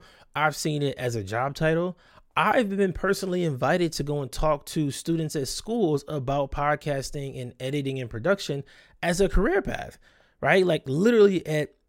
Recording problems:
none

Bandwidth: 16 kHz